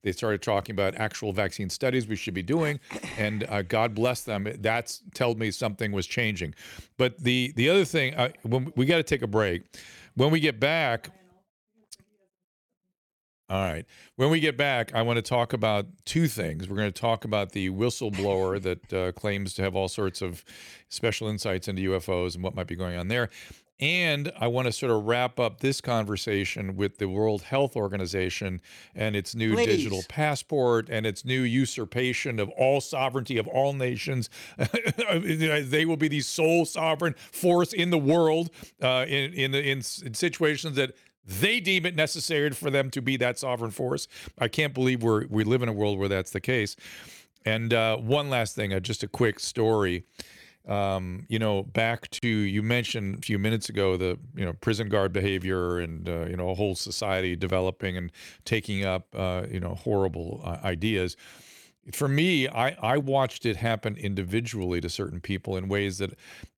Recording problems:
none

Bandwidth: 17.5 kHz